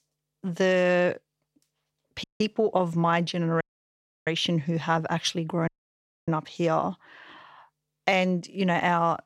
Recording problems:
audio cutting out; at 2 s, at 3.5 s for 0.5 s and at 5.5 s for 0.5 s

